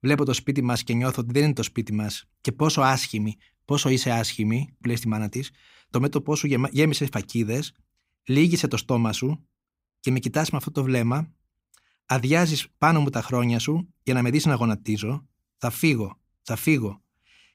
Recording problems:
none

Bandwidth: 15.5 kHz